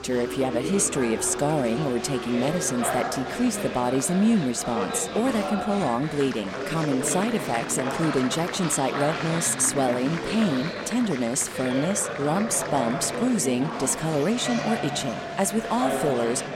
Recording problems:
chatter from many people; loud; throughout; 5 dB below the speech

